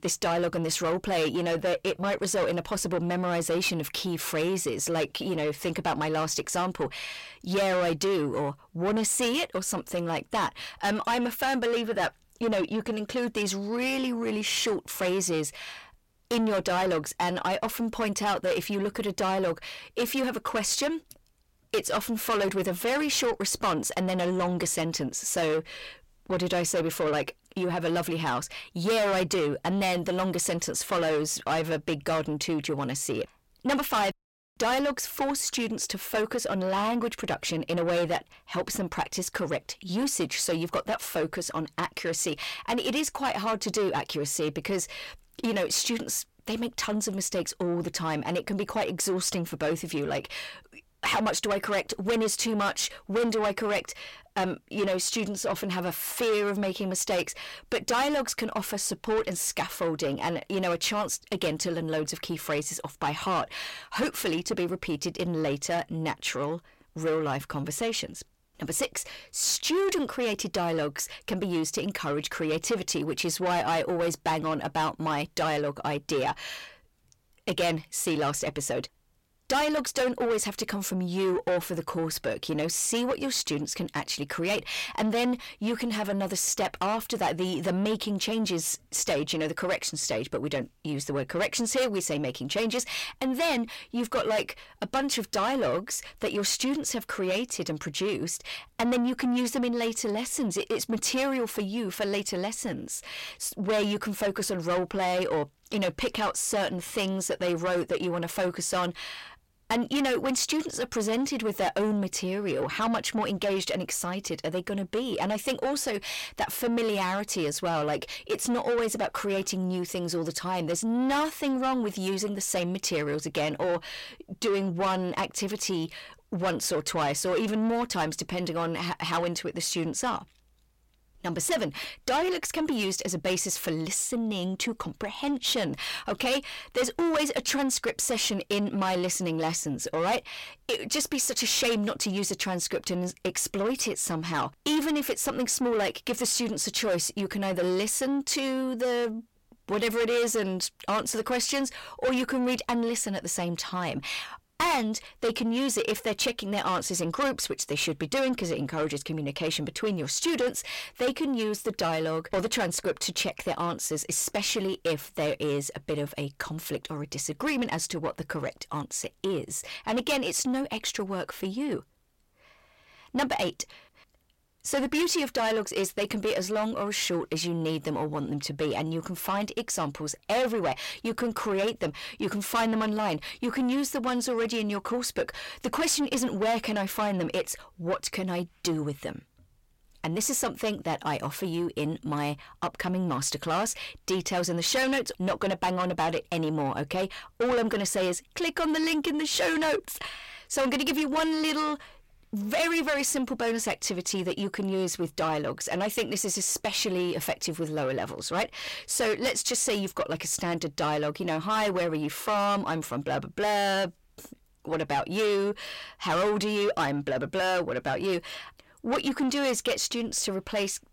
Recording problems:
distortion; heavy; 7 dB below the speech

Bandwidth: 16.5 kHz